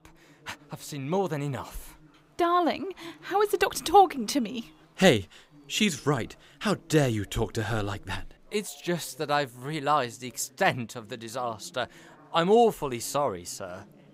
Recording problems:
chatter from many people; faint; throughout; 30 dB below the speech

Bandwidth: 15.5 kHz